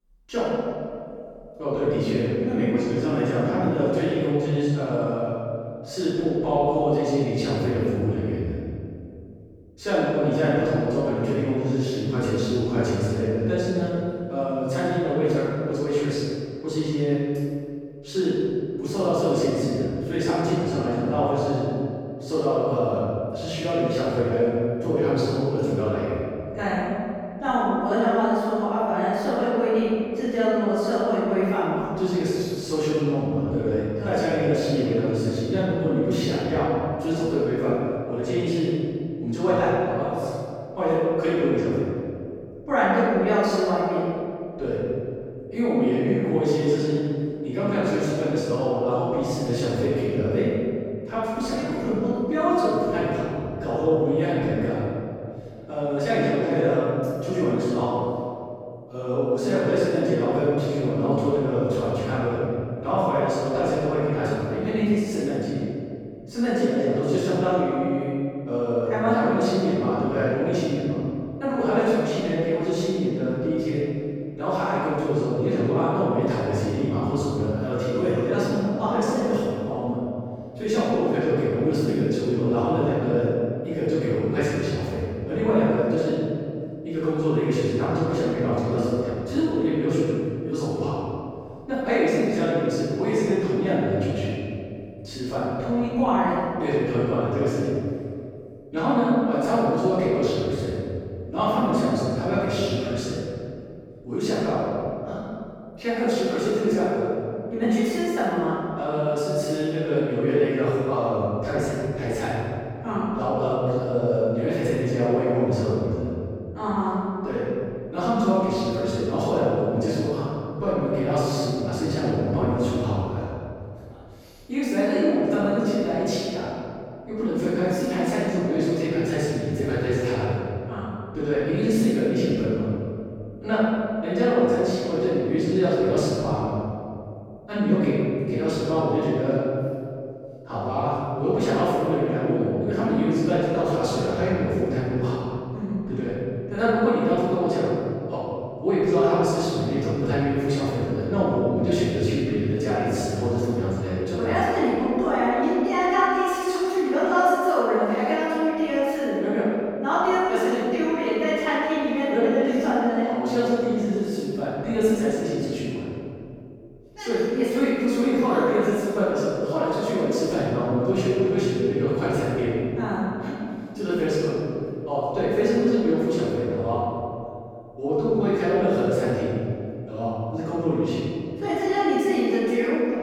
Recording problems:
room echo; strong; dies away in 2.3 s
off-mic speech; far

